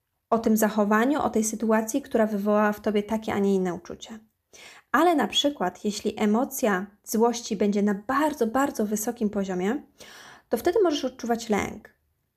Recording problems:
none

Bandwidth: 14.5 kHz